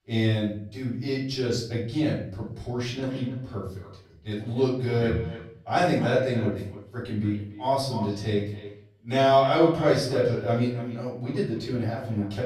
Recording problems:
off-mic speech; far
echo of what is said; noticeable; from 3 s on; 290 ms later, 15 dB below the speech
room echo; noticeable; dies away in 0.6 s

